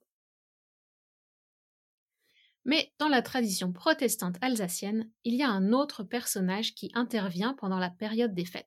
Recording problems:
none

